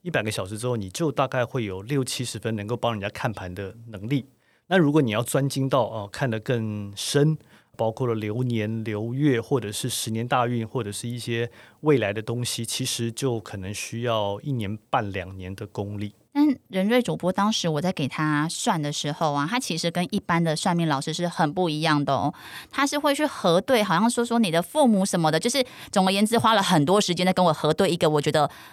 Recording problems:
none

